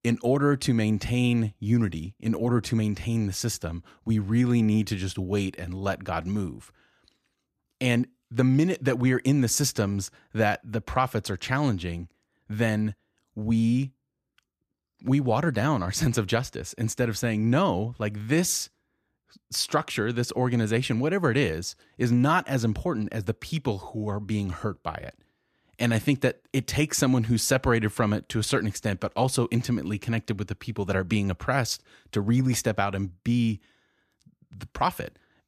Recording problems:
none

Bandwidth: 14.5 kHz